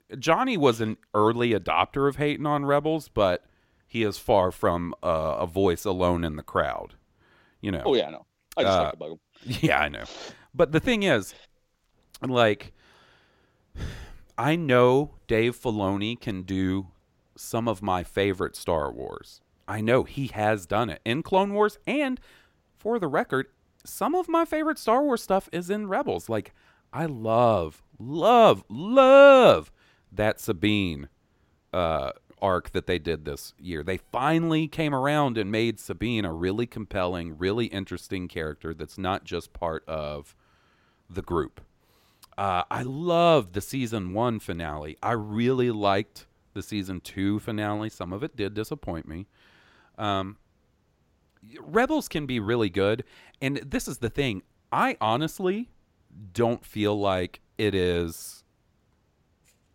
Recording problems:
none

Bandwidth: 16.5 kHz